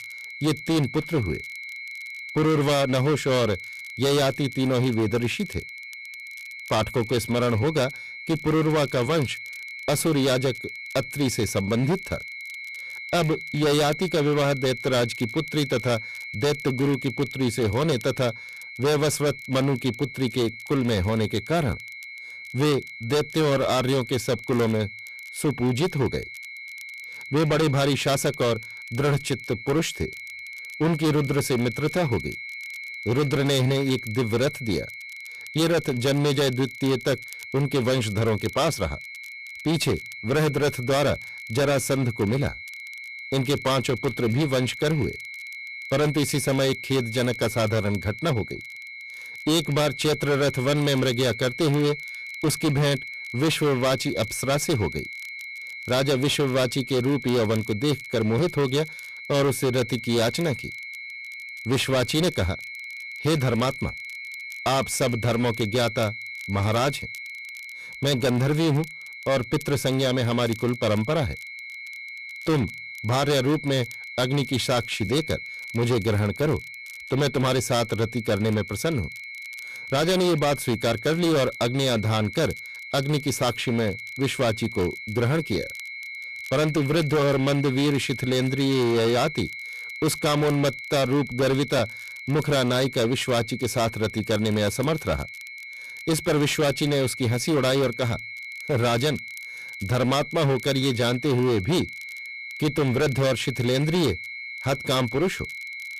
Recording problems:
distortion; heavy; 17% of the sound clipped
high-pitched whine; noticeable; throughout; 2 kHz, 10 dB below the speech
crackle, like an old record; faint; 25 dB below the speech

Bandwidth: 14.5 kHz